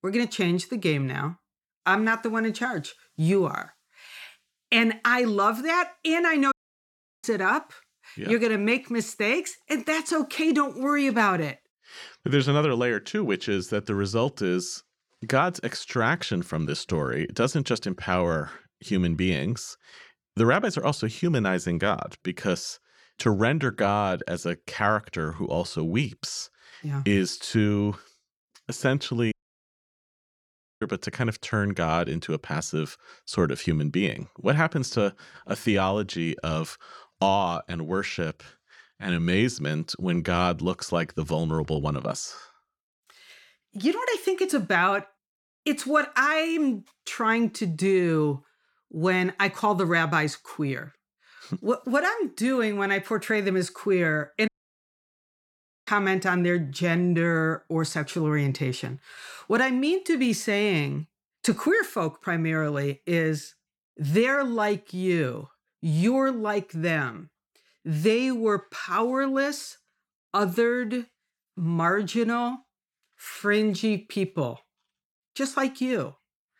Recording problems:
audio cutting out; at 6.5 s for 0.5 s, at 29 s for 1.5 s and at 54 s for 1.5 s

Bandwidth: 18 kHz